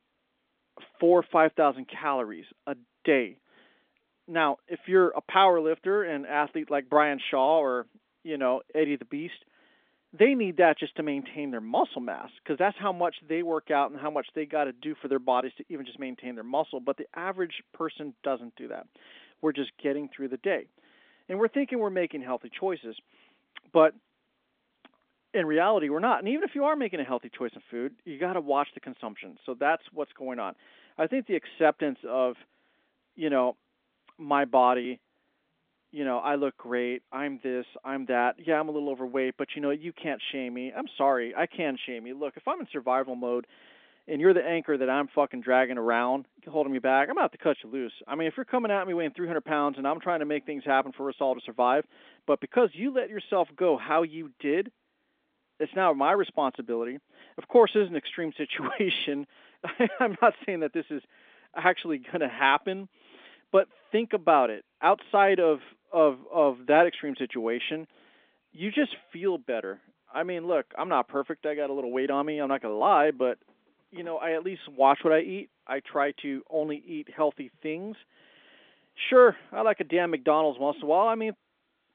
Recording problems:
phone-call audio; nothing above 3.5 kHz

